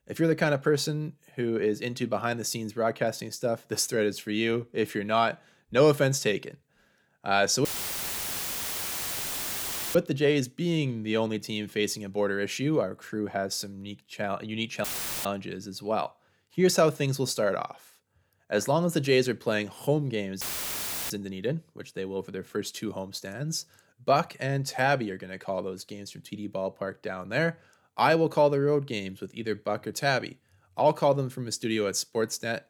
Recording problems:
audio cutting out; filled with static; at 7.5 s for 2.5 s, at 15 s and at 20 s for 0.5 s

